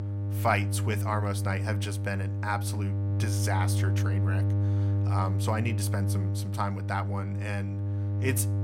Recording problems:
electrical hum; loud; throughout; 50 Hz, 8 dB below the speech

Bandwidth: 16.5 kHz